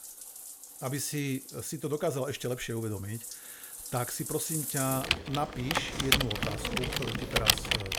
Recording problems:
household noises; very loud; throughout; 4 dB above the speech

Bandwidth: 18 kHz